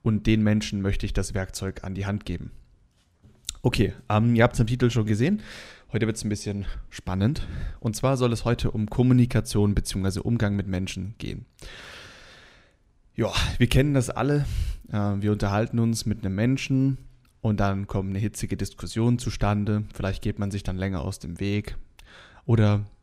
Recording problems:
none

